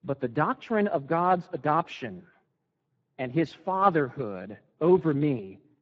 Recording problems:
garbled, watery; badly
muffled; very; fading above 2 kHz

